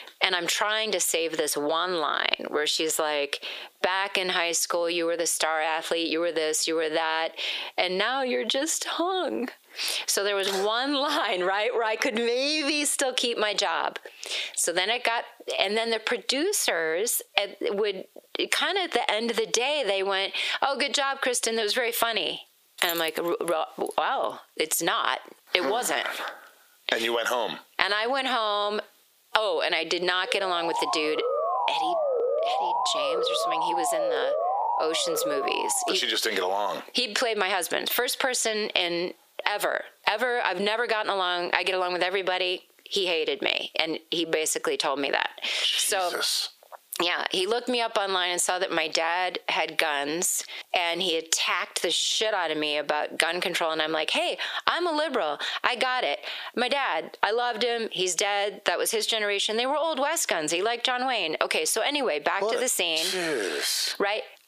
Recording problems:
squashed, flat; heavily
thin; somewhat; fading below 400 Hz
jangling keys; noticeable; from 23 to 24 s; peak 7 dB below the speech
siren; loud; from 30 to 36 s; peak level with the speech

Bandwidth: 15 kHz